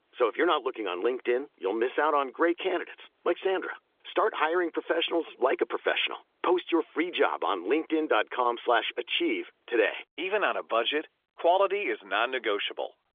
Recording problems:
phone-call audio; nothing above 3.5 kHz

